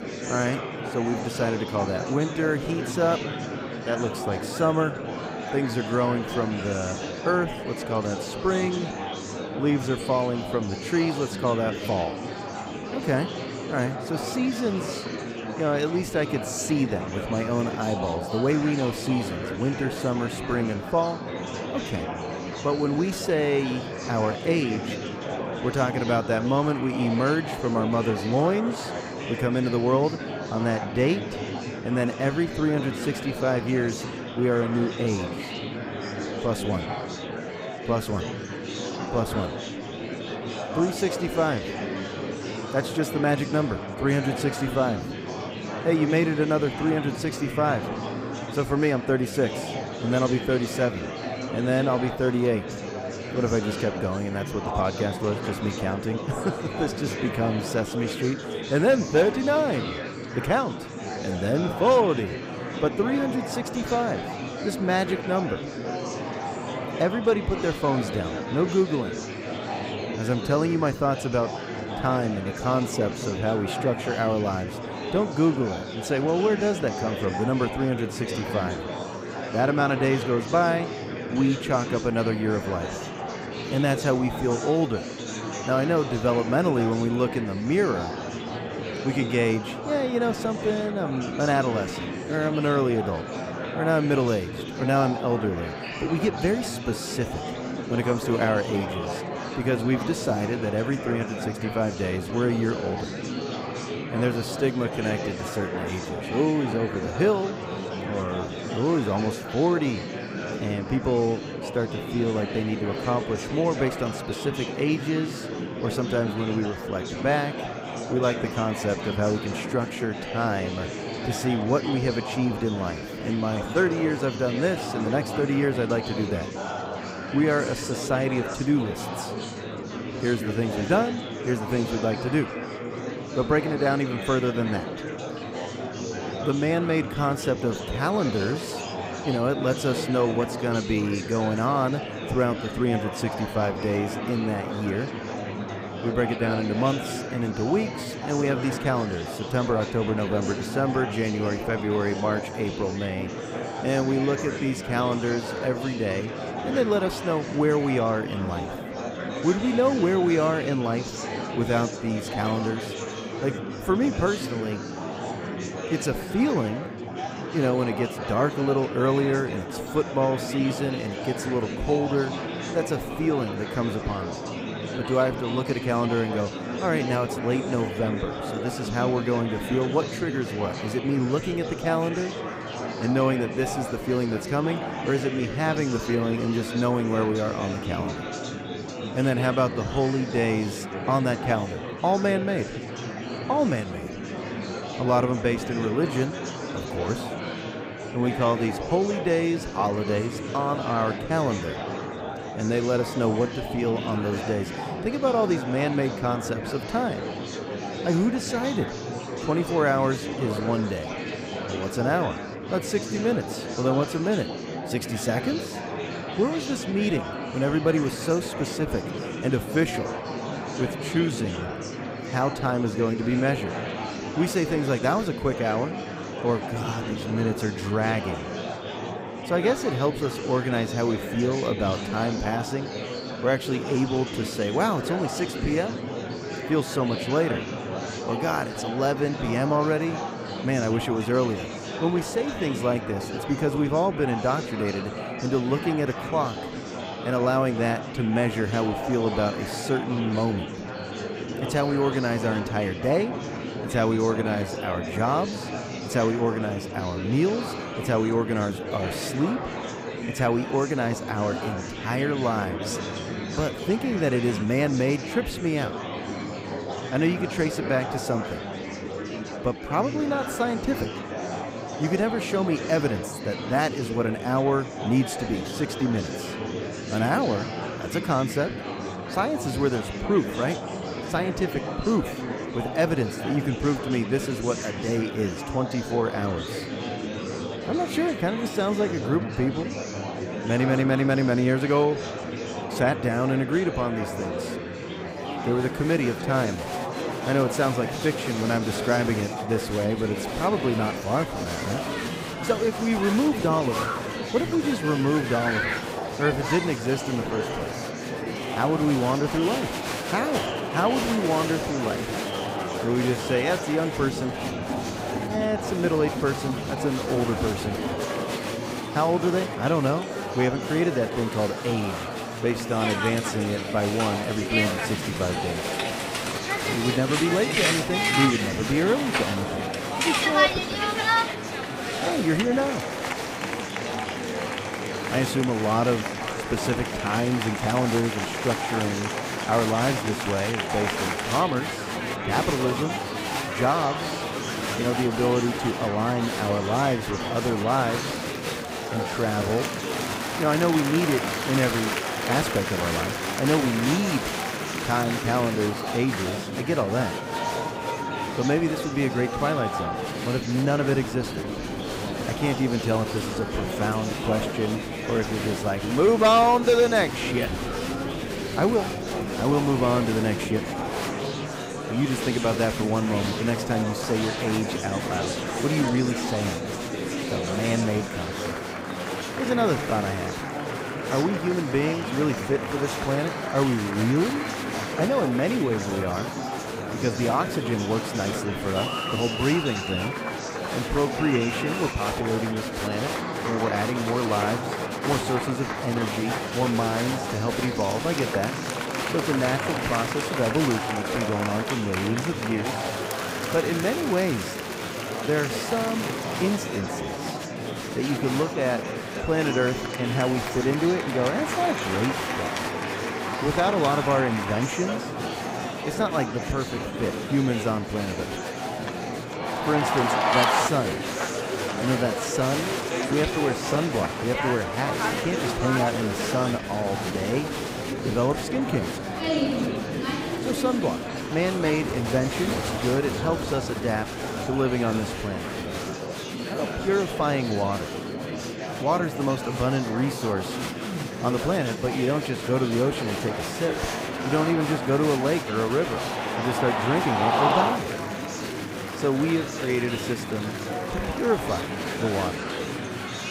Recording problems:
murmuring crowd; loud; throughout; 4 dB below the speech

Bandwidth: 15.5 kHz